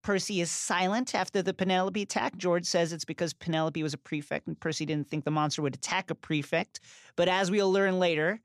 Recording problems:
none

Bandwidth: 14.5 kHz